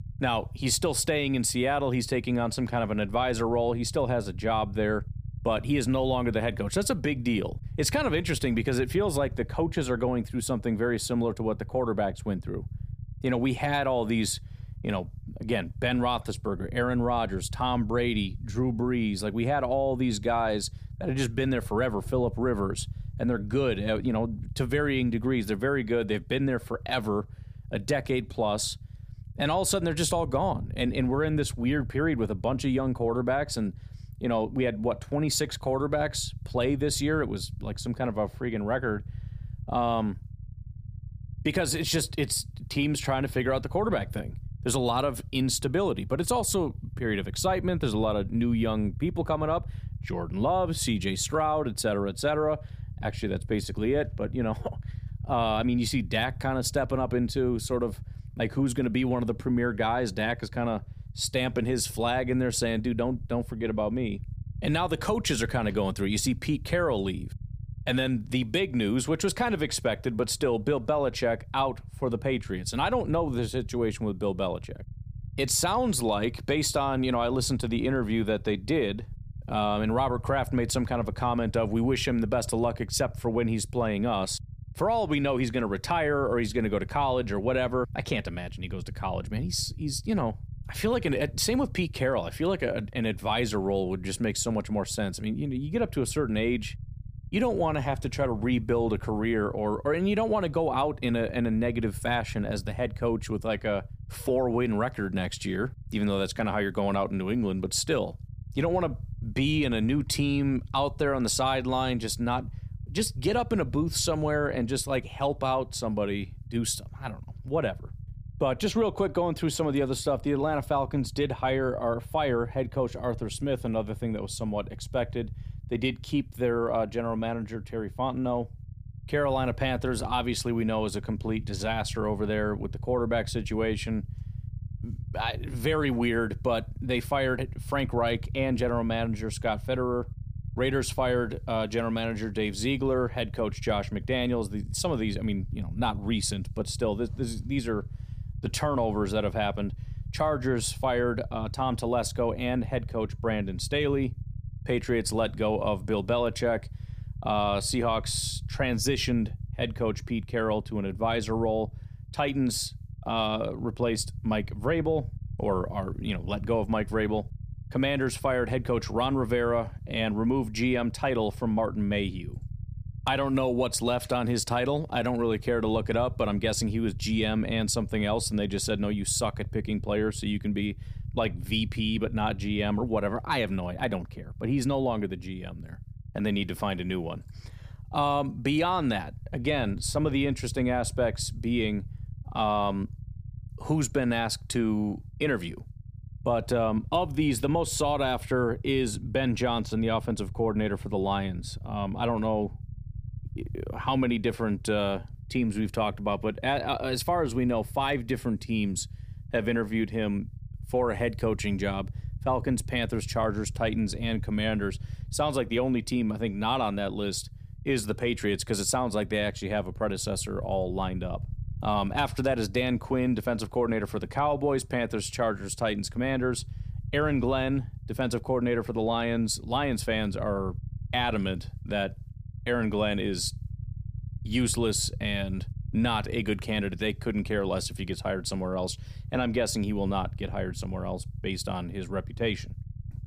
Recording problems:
low rumble; faint; throughout; 25 dB below the speech

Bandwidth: 15 kHz